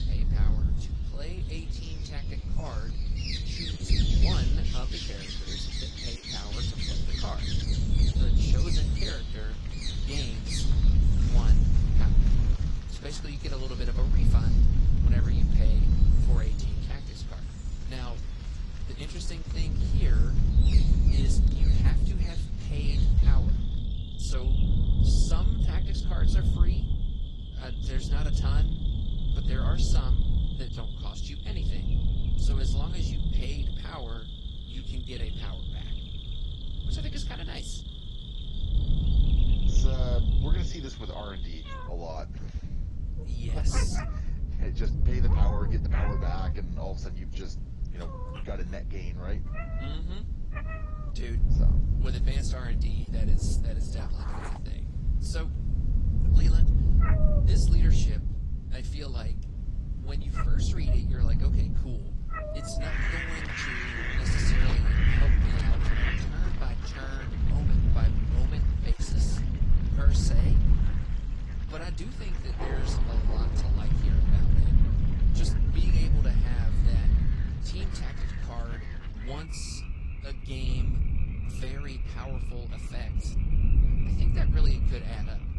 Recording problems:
garbled, watery; slightly
animal sounds; very loud; throughout; as loud as the speech
wind noise on the microphone; heavy; 1 dB below the speech

